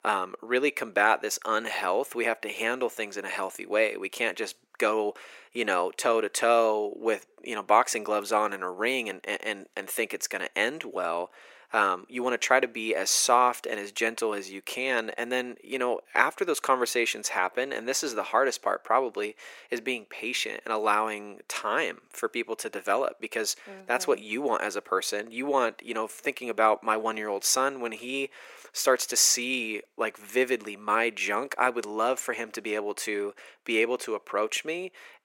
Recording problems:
thin; very; fading below 350 Hz

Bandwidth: 16 kHz